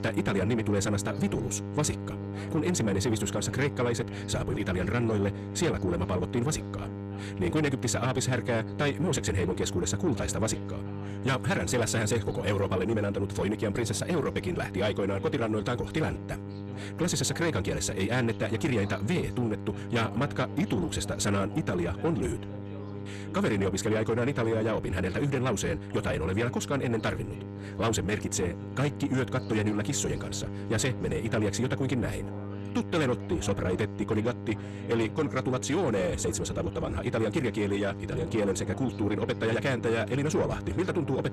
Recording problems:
wrong speed, natural pitch; too fast; 1.5 times normal speed
distortion; slight; 10 dB below the speech
electrical hum; noticeable; throughout; 50 Hz, 15 dB below the speech
background chatter; noticeable; throughout; 3 voices, 20 dB below the speech

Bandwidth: 14 kHz